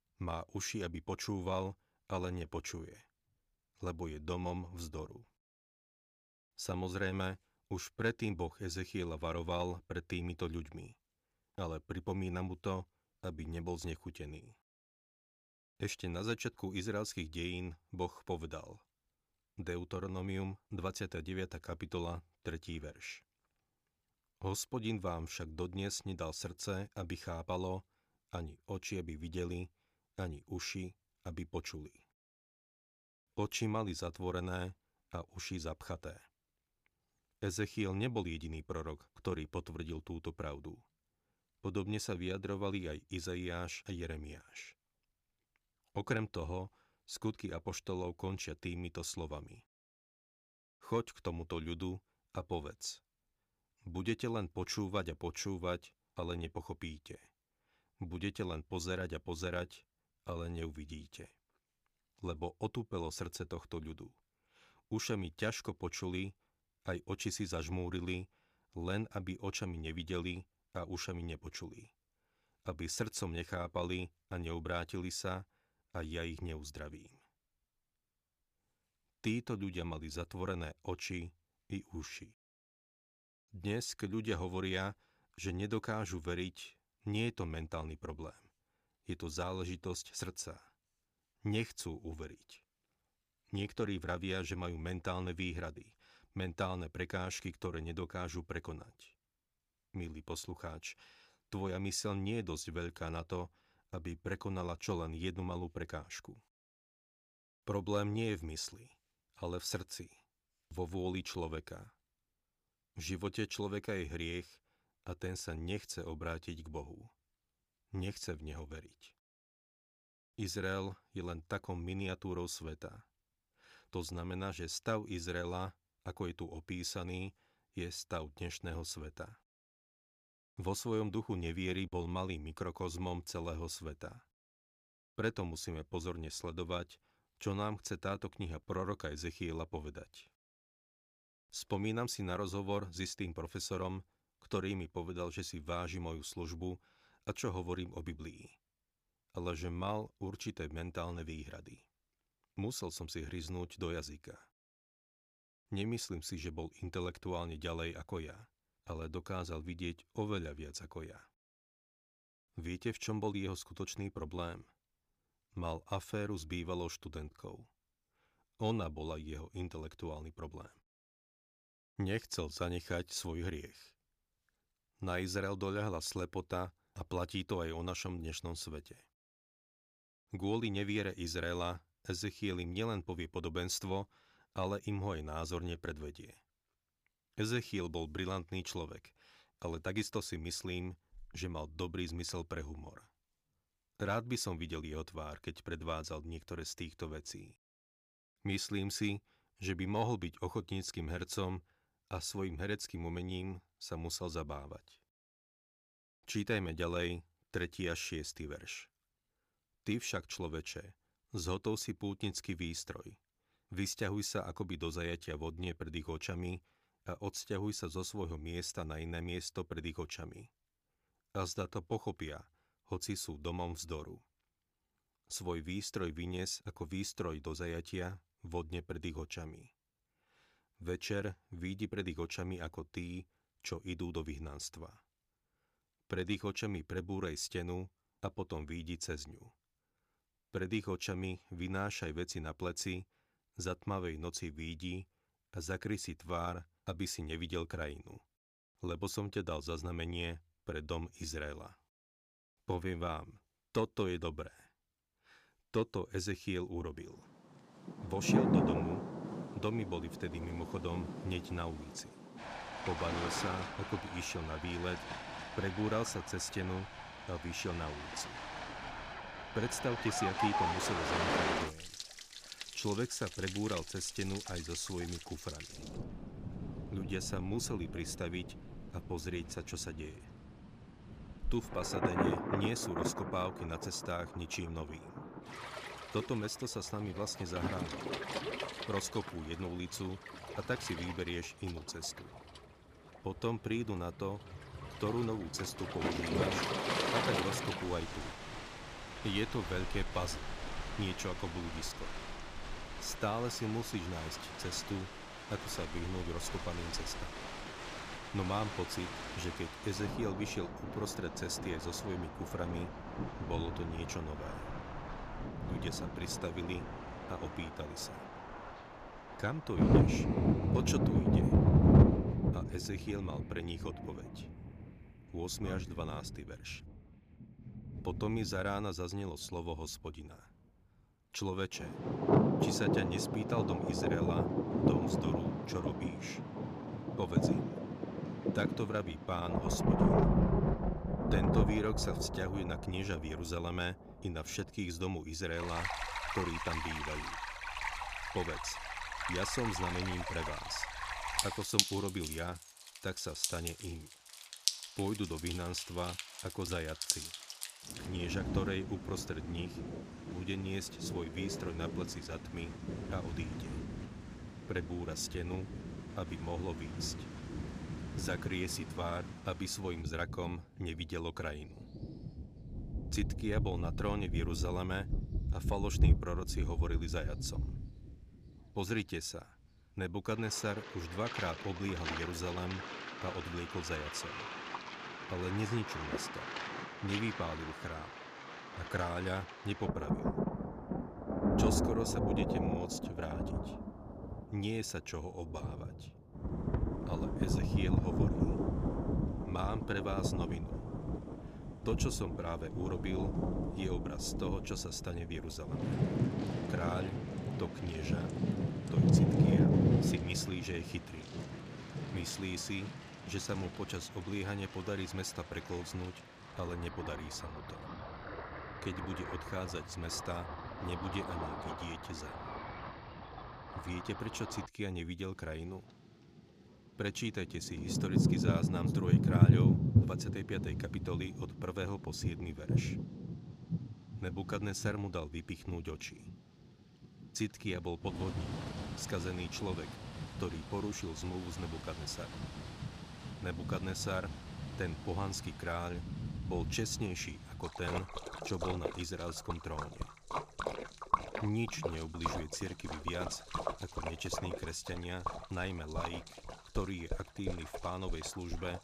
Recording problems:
rain or running water; very loud; from 4:18 on; 3 dB above the speech

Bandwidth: 15 kHz